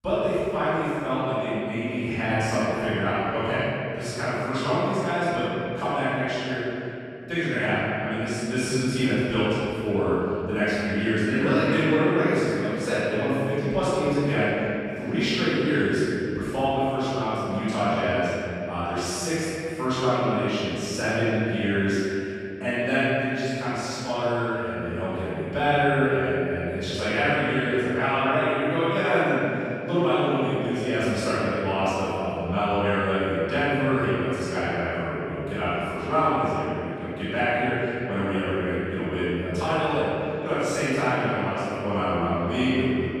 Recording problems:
room echo; strong; dies away in 2.9 s
off-mic speech; far
echo of what is said; faint; throughout; 130 ms later, 25 dB below the speech

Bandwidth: 13.5 kHz